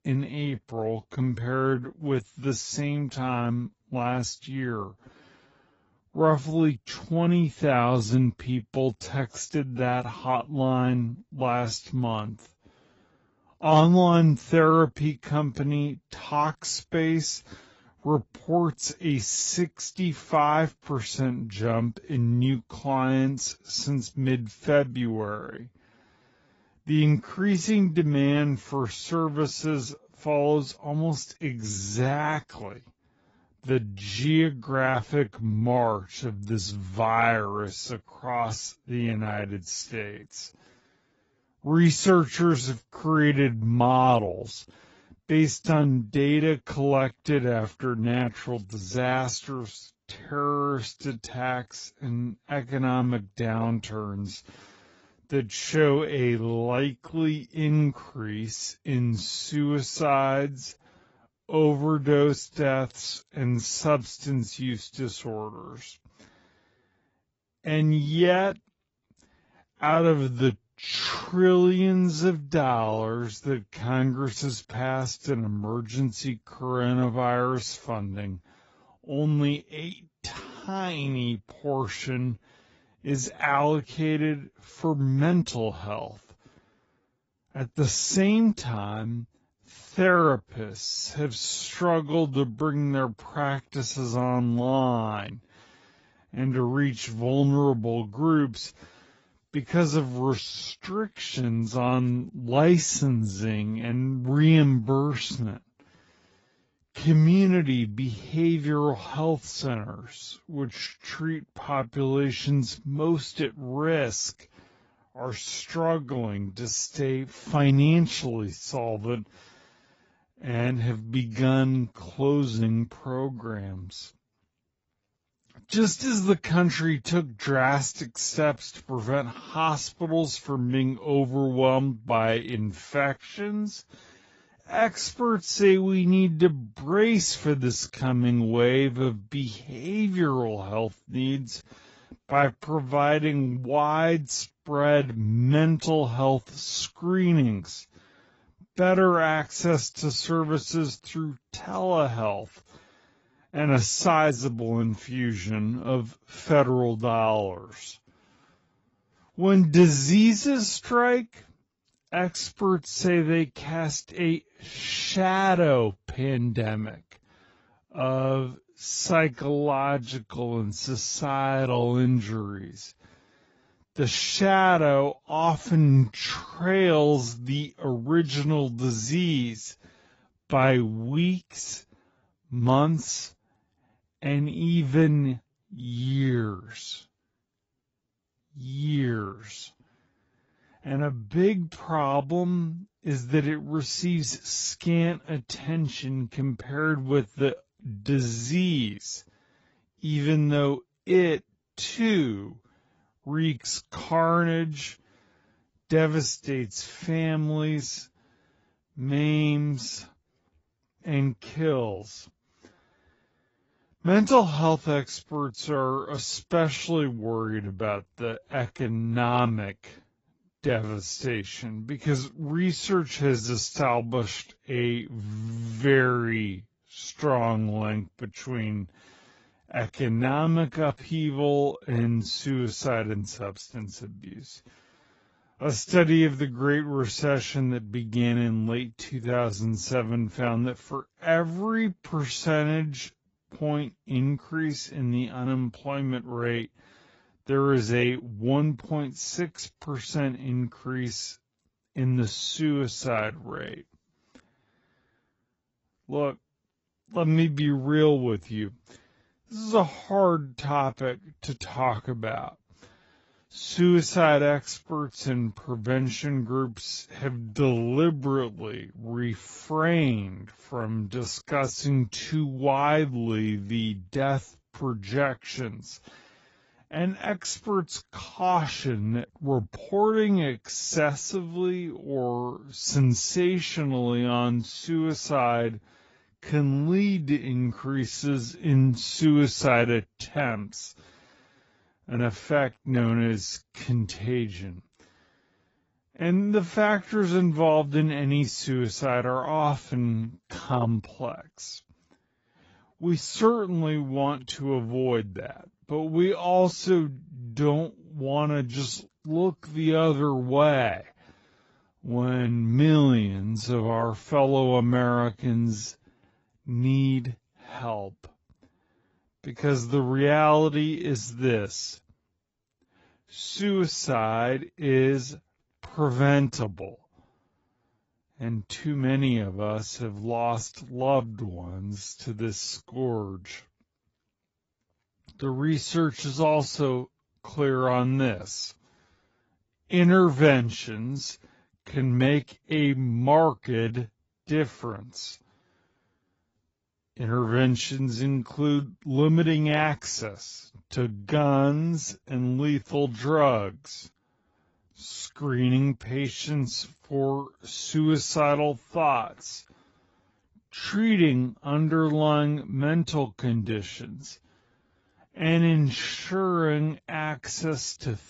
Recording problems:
garbled, watery; badly; nothing above 7.5 kHz
wrong speed, natural pitch; too slow; 0.6 times normal speed

